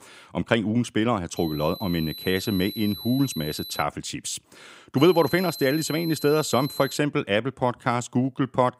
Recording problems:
high-pitched whine; noticeable; from 1.5 to 4 s and from 5 to 7 s; 4 kHz, 10 dB below the speech

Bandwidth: 15.5 kHz